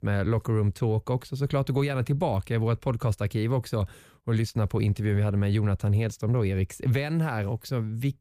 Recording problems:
none

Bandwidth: 15 kHz